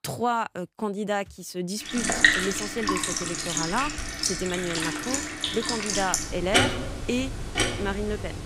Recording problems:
household noises; very loud; from 2 s on; 4 dB above the speech

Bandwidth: 15.5 kHz